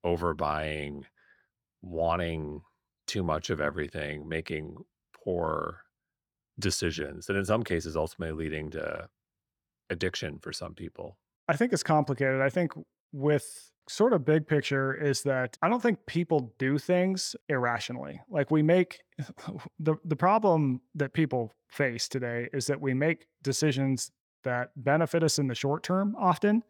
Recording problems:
none

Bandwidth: 18.5 kHz